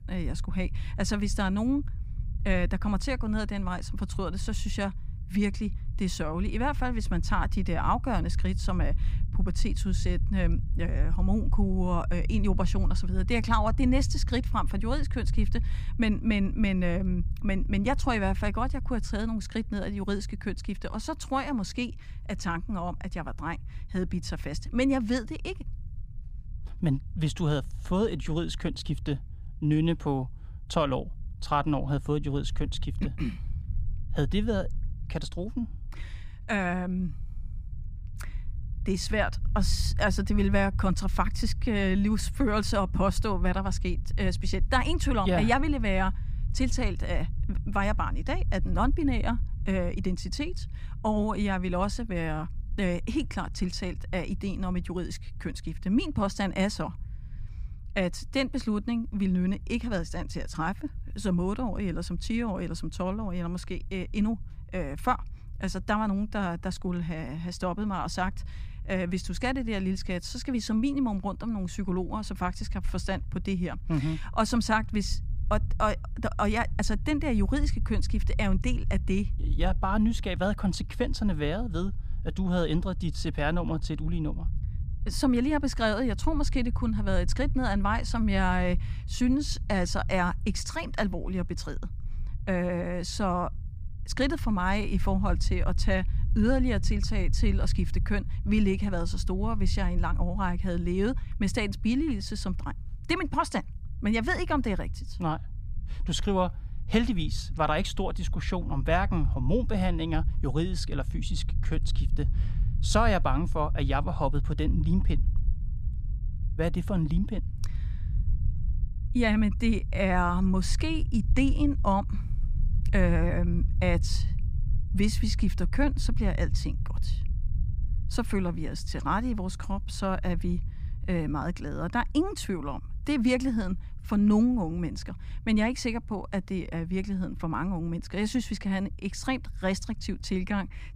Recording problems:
low rumble; faint; throughout; 20 dB below the speech

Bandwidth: 15 kHz